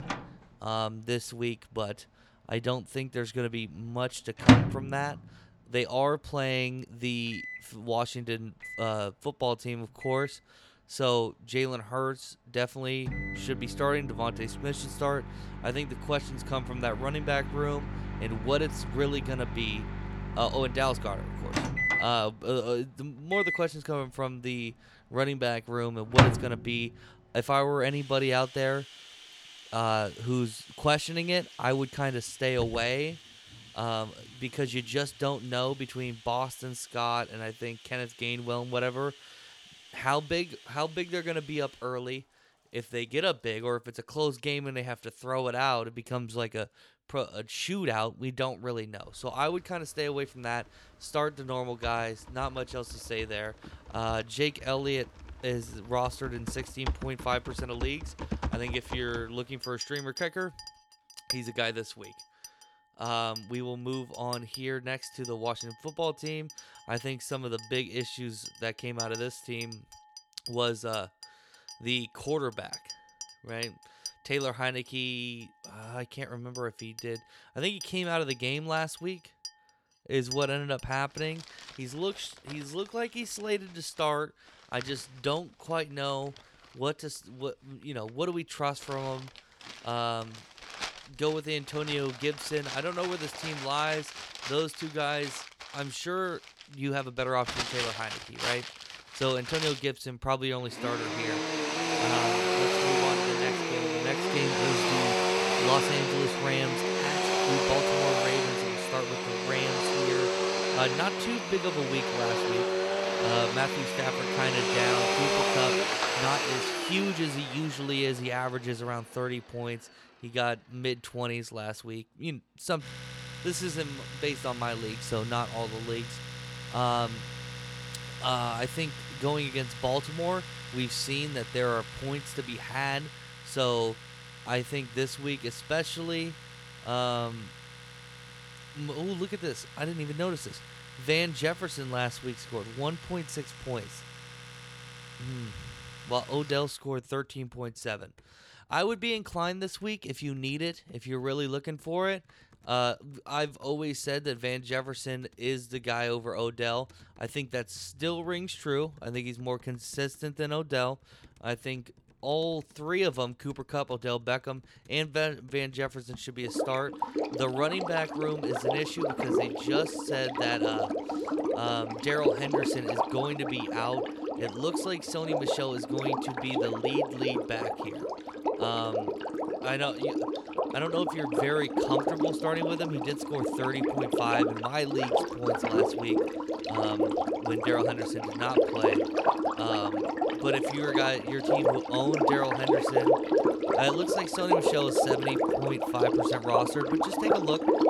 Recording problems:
household noises; very loud; throughout; 2 dB above the speech

